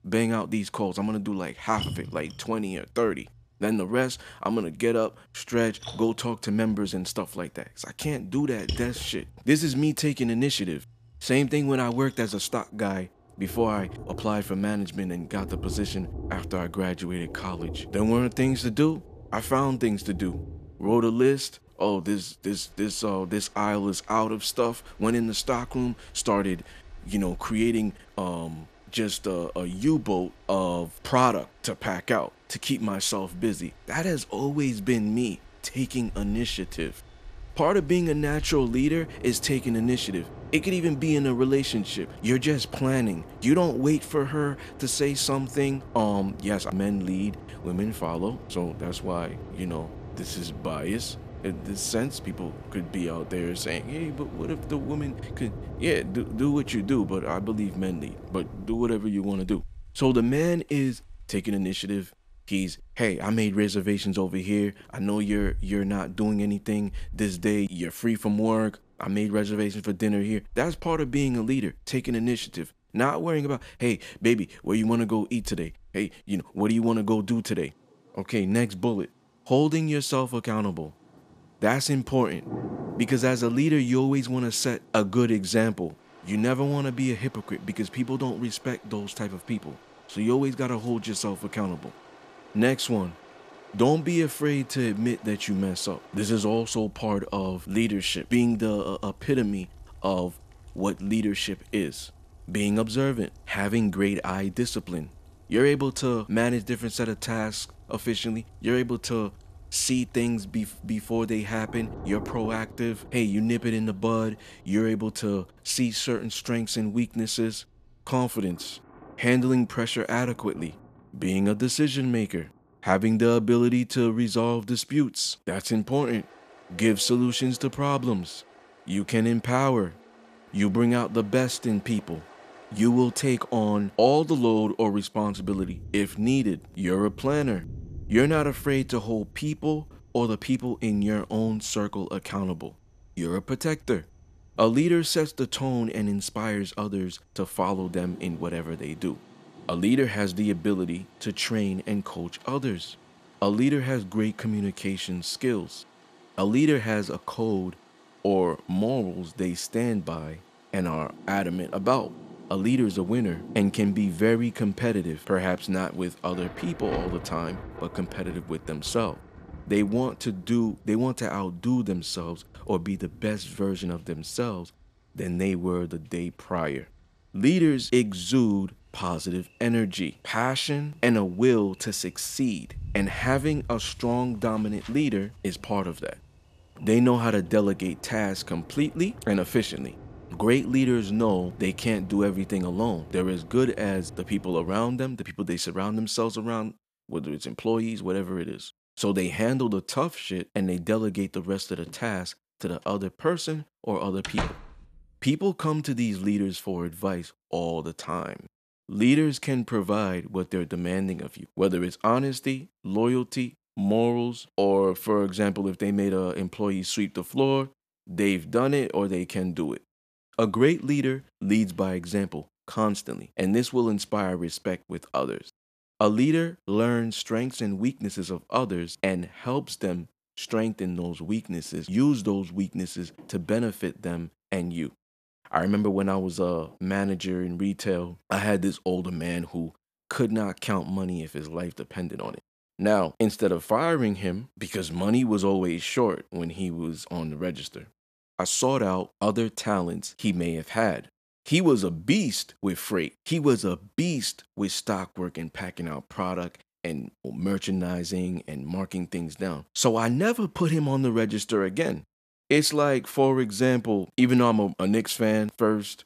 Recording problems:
rain or running water; noticeable; until 3:15; 20 dB below the speech
door banging; noticeable; at 3:24; peak 4 dB below the speech

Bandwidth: 14.5 kHz